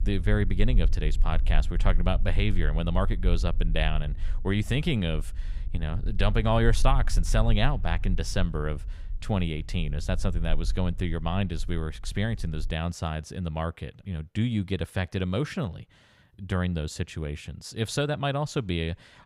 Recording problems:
low rumble; faint; until 13 s; 20 dB below the speech

